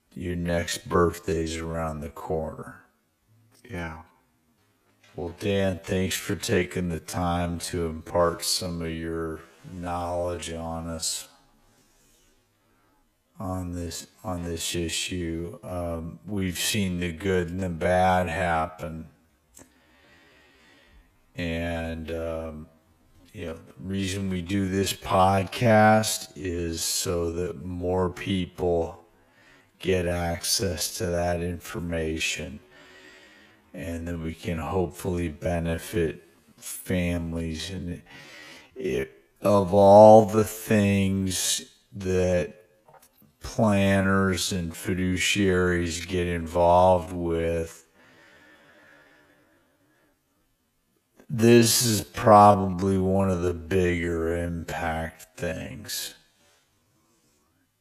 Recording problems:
wrong speed, natural pitch; too slow; 0.5 times normal speed

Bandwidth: 14.5 kHz